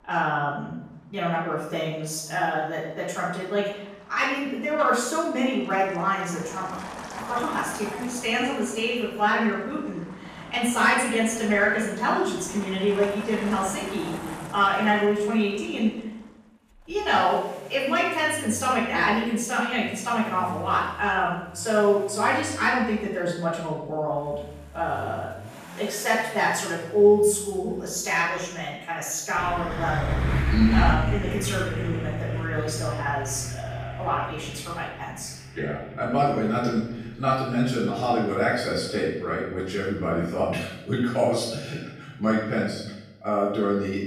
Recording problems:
off-mic speech; far
room echo; noticeable; dies away in 0.8 s
traffic noise; loud; throughout; 10 dB below the speech

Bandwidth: 14.5 kHz